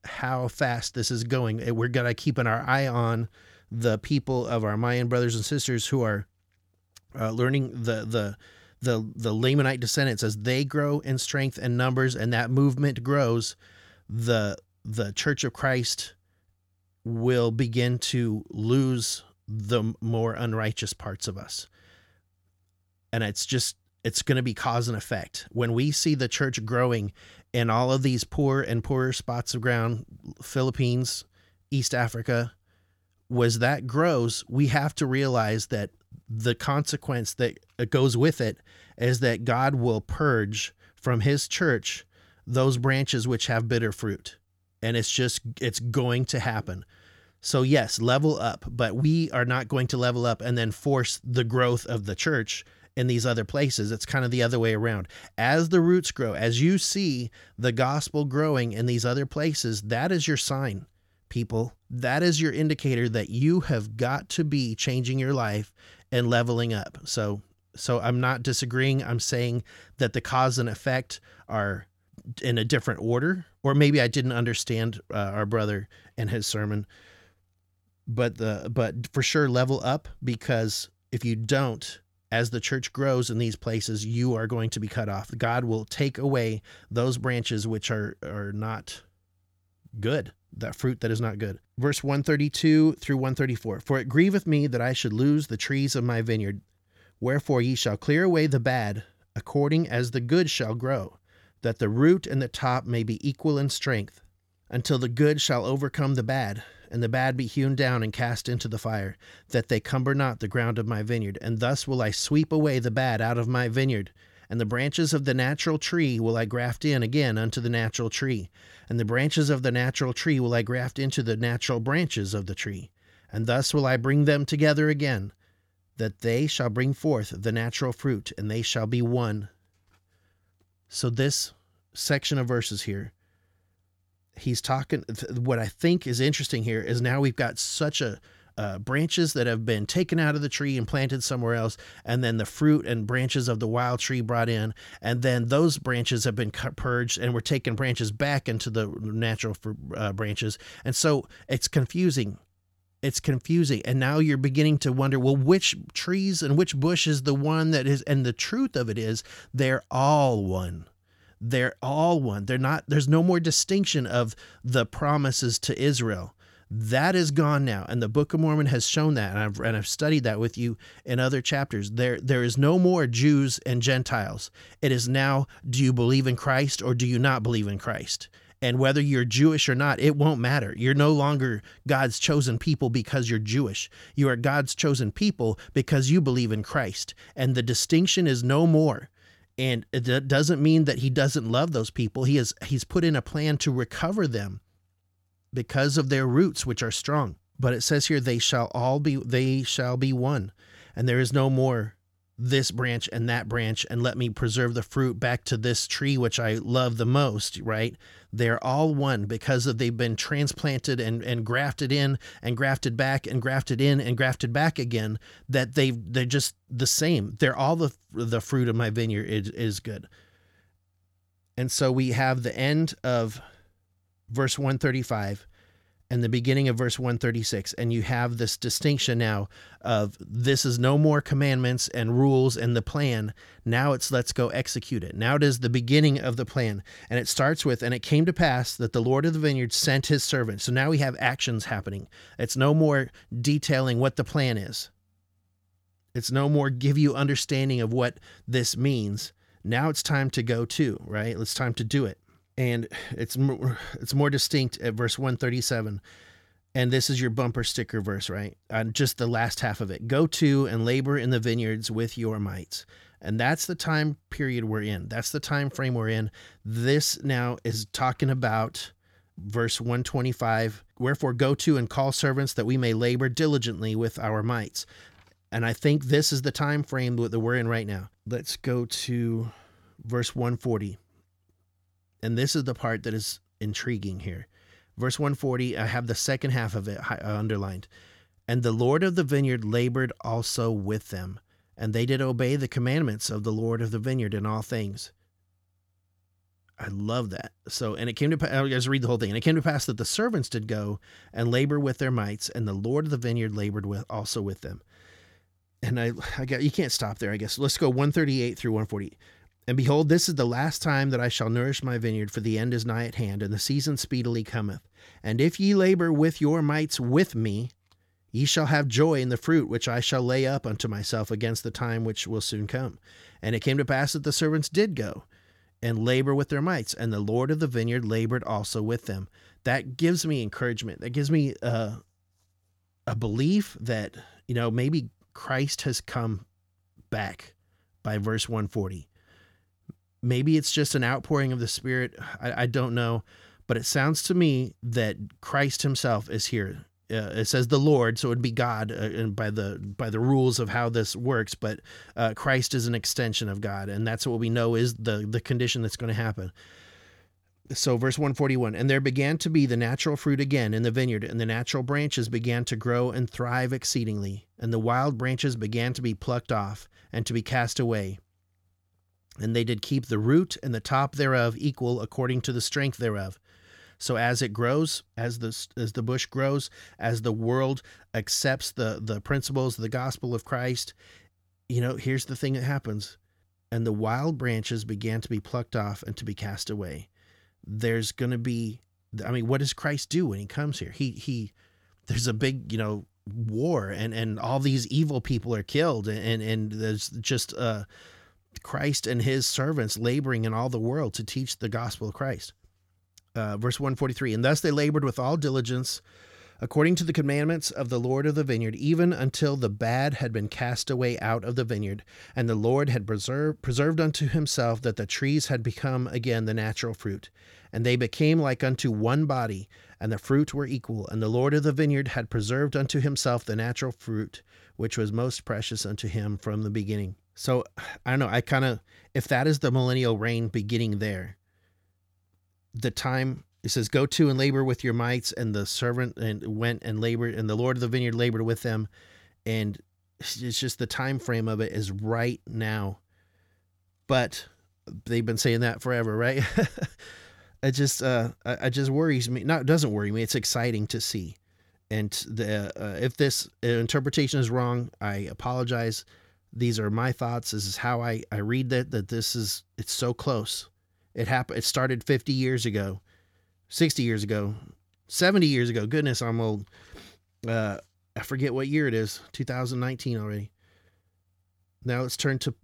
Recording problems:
none

